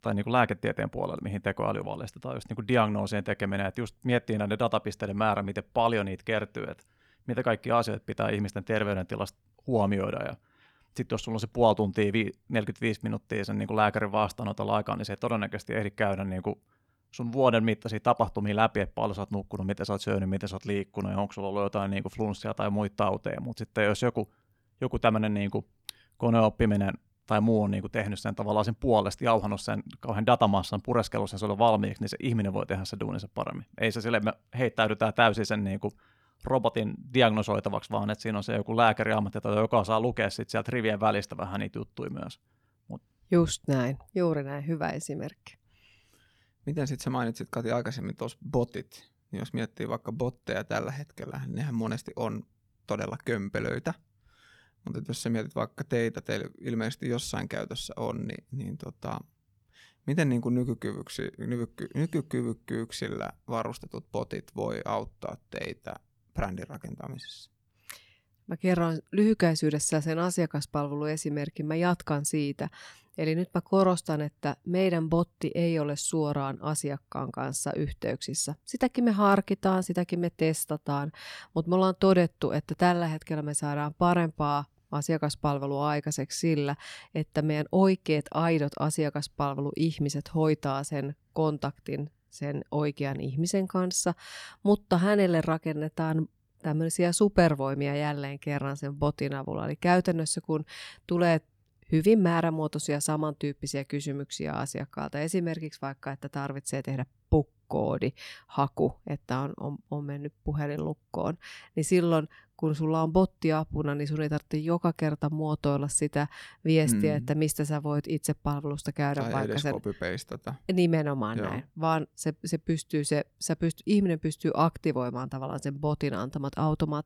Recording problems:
none

